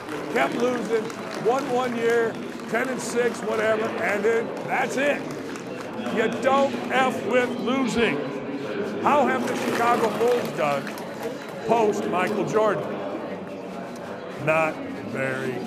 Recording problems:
murmuring crowd; loud; throughout; 5 dB below the speech

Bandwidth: 14.5 kHz